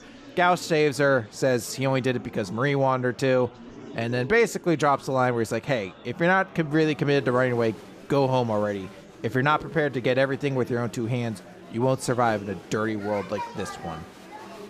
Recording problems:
murmuring crowd; noticeable; throughout; 20 dB below the speech

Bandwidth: 15 kHz